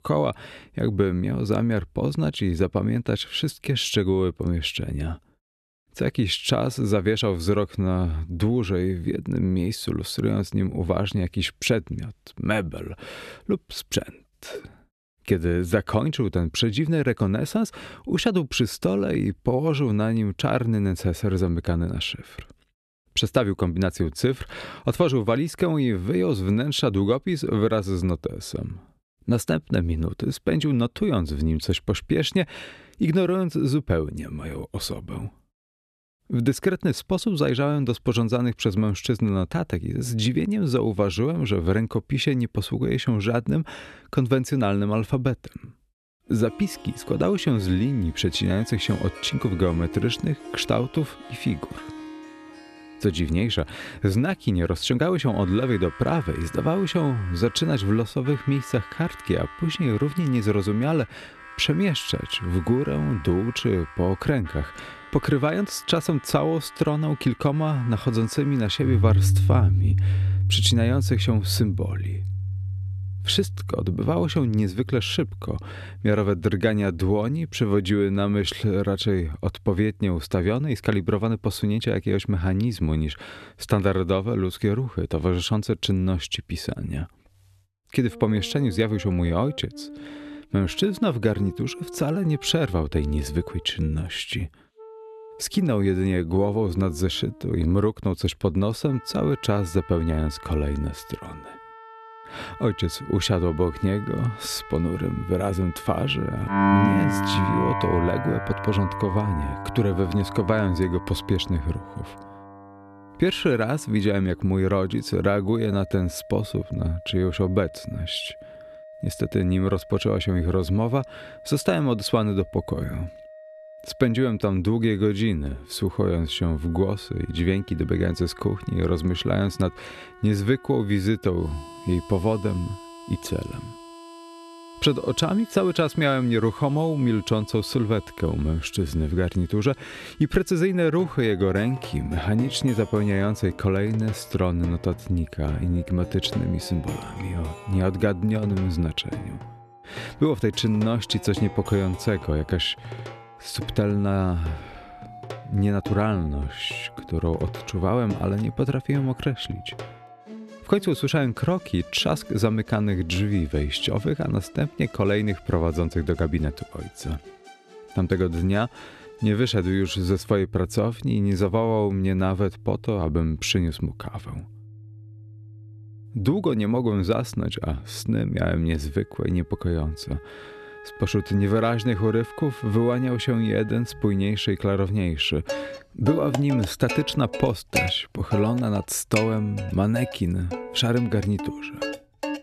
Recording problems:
background music; loud; from 46 s on; 10 dB below the speech

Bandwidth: 13.5 kHz